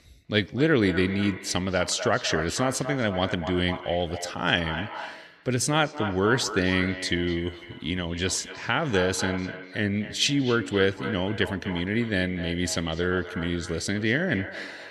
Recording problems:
echo of what is said; strong; throughout; 250 ms later, 10 dB below the speech

